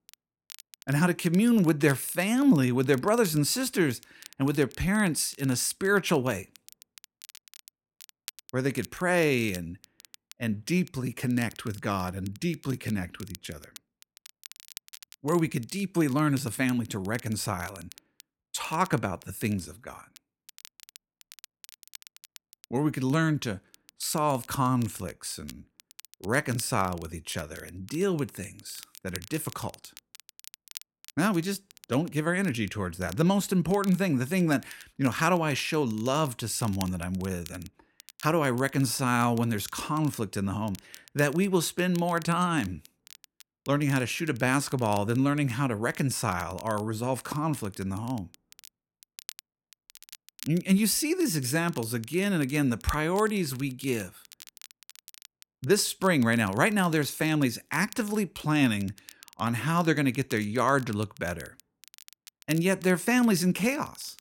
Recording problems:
crackle, like an old record; faint; 20 dB below the speech

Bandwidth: 16.5 kHz